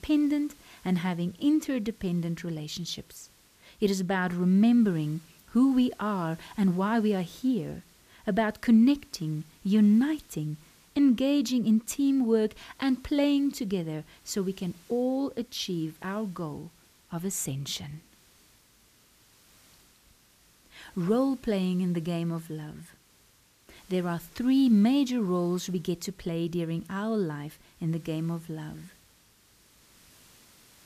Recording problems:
hiss; faint; throughout; 30 dB below the speech

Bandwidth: 14.5 kHz